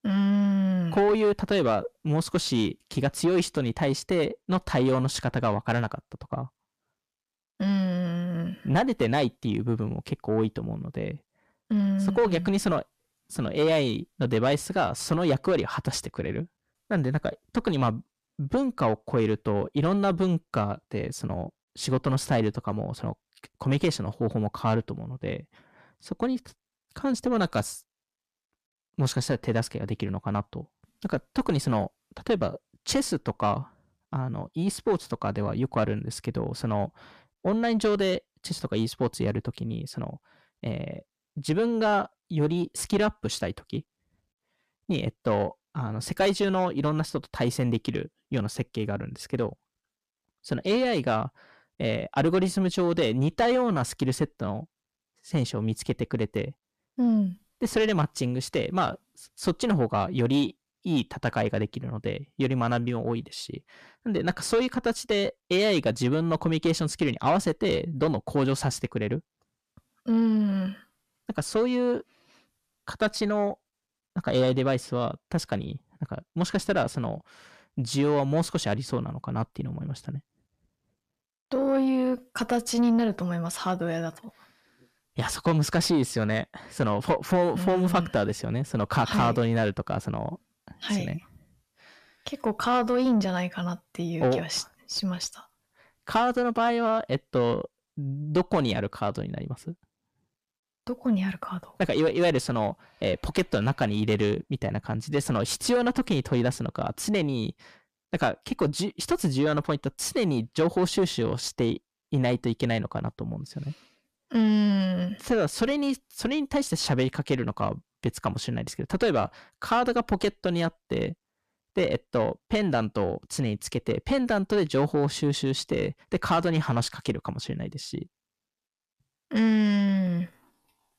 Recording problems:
distortion; slight; 9 dB below the speech

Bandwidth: 14.5 kHz